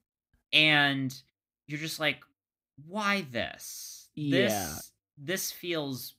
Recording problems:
none

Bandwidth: 15.5 kHz